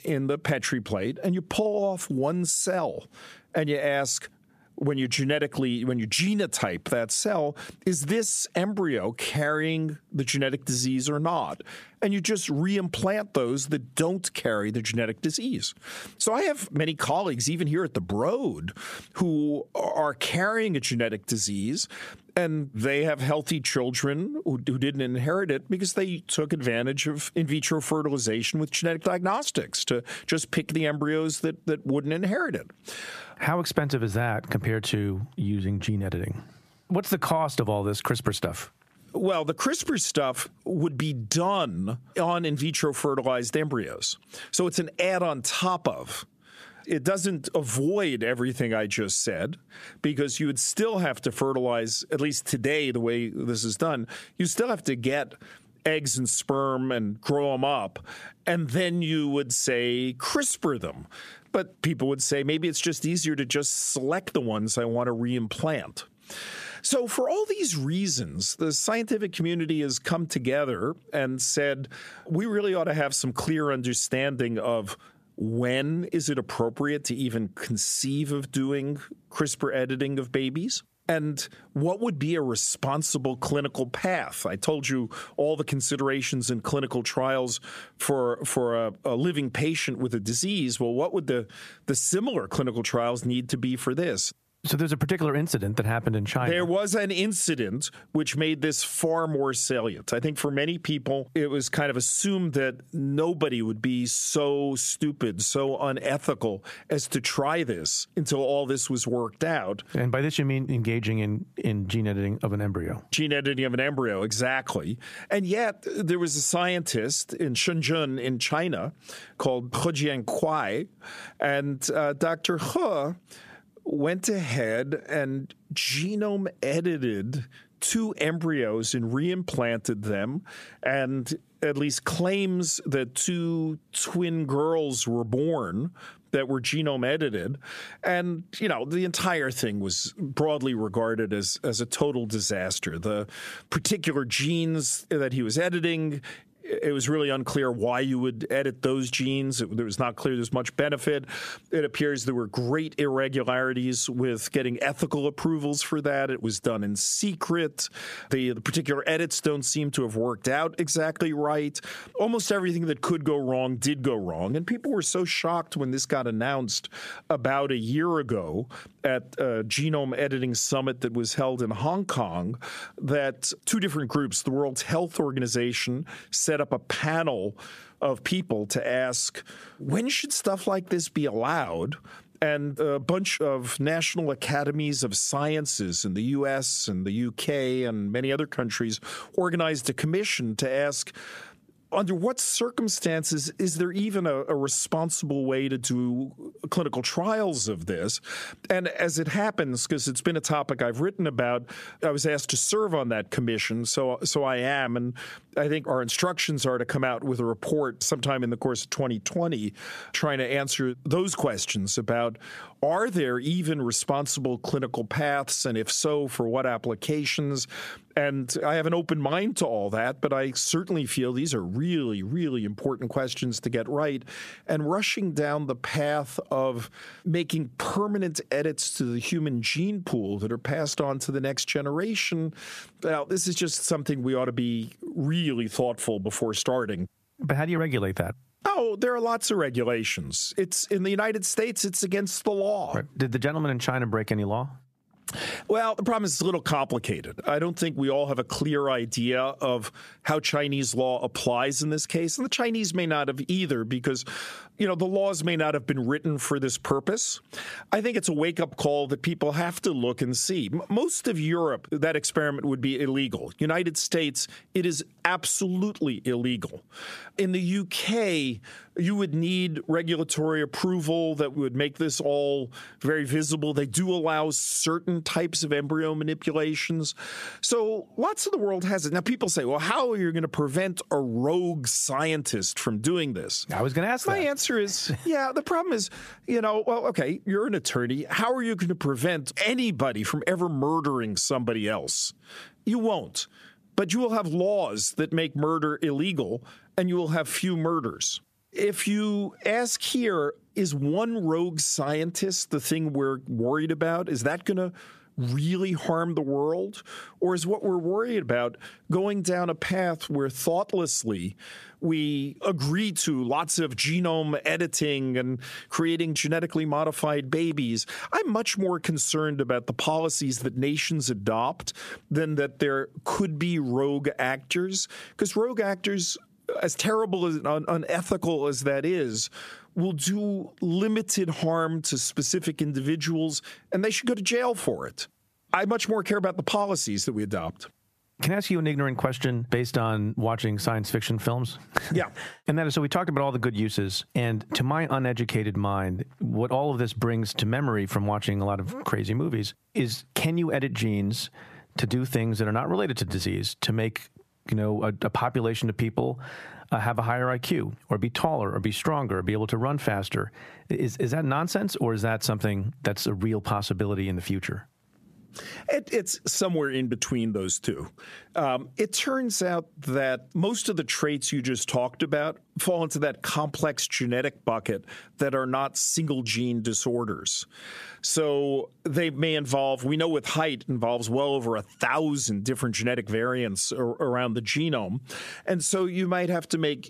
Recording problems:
squashed, flat; heavily

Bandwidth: 14.5 kHz